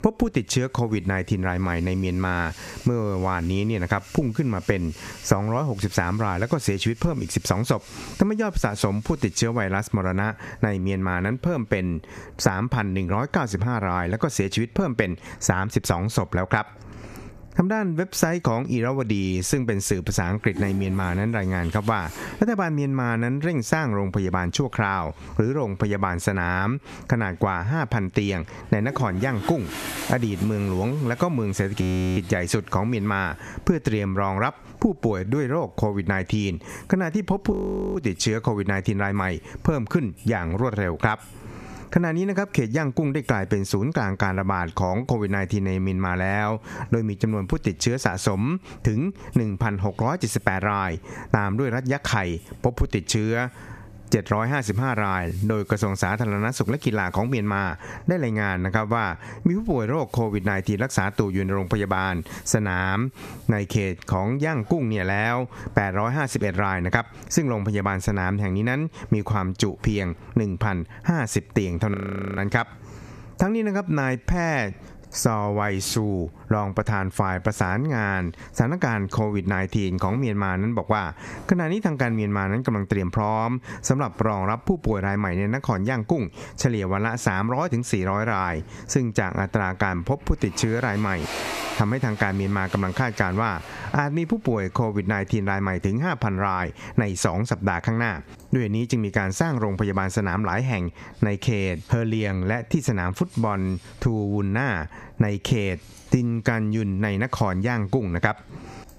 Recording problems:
squashed, flat; somewhat, background pumping
household noises; noticeable; throughout; 20 dB below the speech
audio freezing; at 32 s, at 38 s and at 1:12

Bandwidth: 14.5 kHz